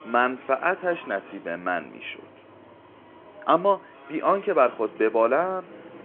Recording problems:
phone-call audio
traffic noise; faint; throughout; 20 dB below the speech

